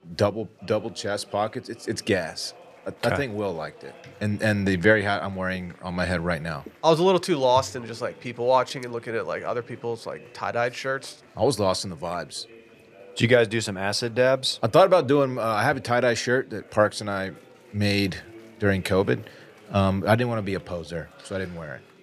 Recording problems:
chatter from many people; faint; throughout; 25 dB below the speech

